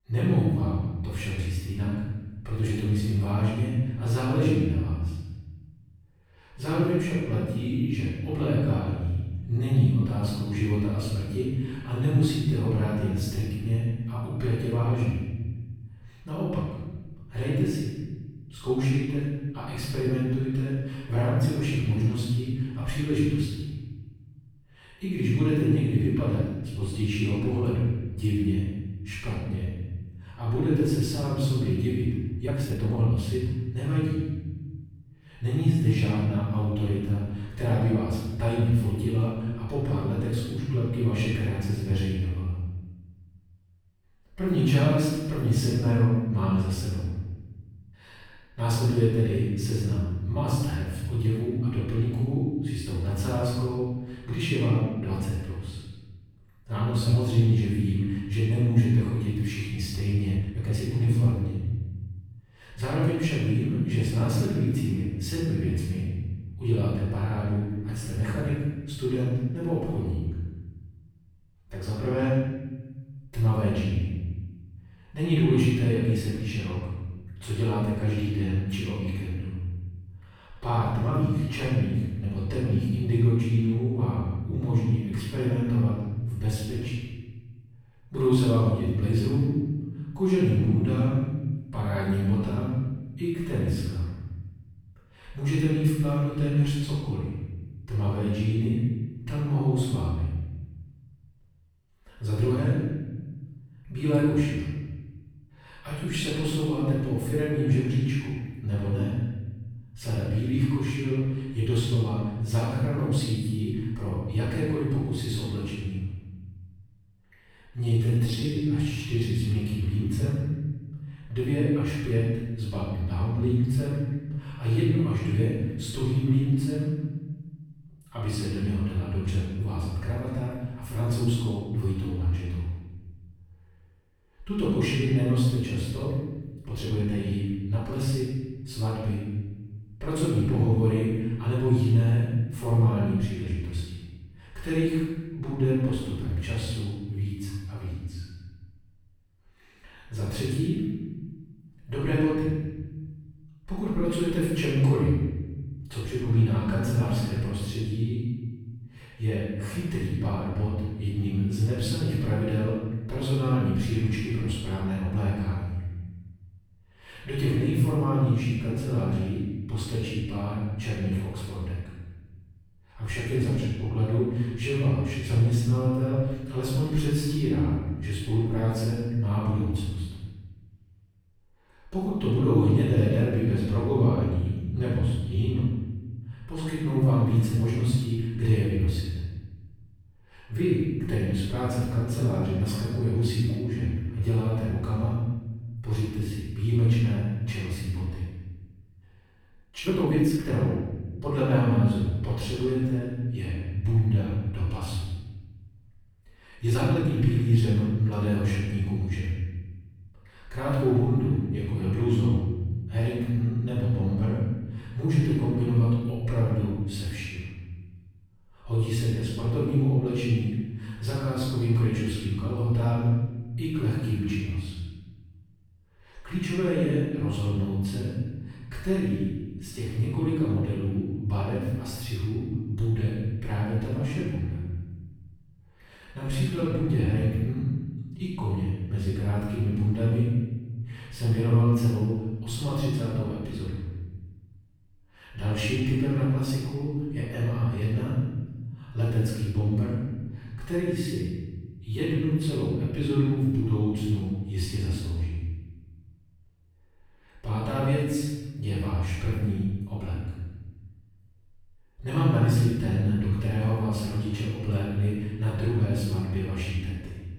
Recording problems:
room echo; strong; dies away in 1.4 s
off-mic speech; far
uneven, jittery; strongly; from 32 s to 3:57

